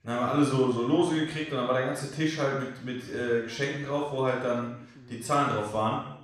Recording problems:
off-mic speech; far
room echo; noticeable; dies away in 0.7 s
background chatter; faint; throughout; 2 voices, 25 dB below the speech

